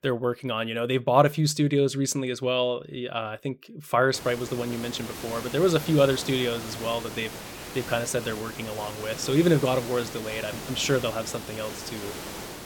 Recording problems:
hiss; noticeable; from 4 s on; 10 dB below the speech

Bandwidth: 17 kHz